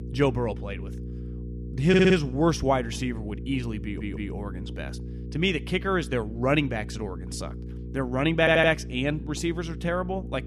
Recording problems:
electrical hum; noticeable; throughout; 60 Hz, 20 dB below the speech
audio stuttering; at 2 s, at 4 s and at 8.5 s

